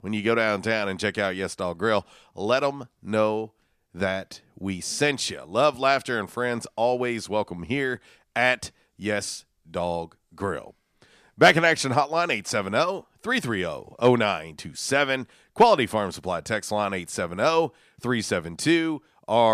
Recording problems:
abrupt cut into speech; at the end

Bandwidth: 14.5 kHz